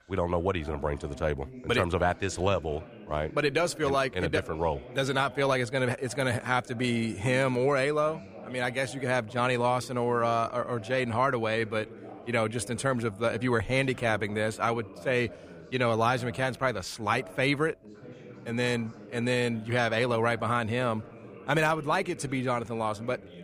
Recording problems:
background chatter; noticeable; throughout; 2 voices, 20 dB below the speech

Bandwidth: 15 kHz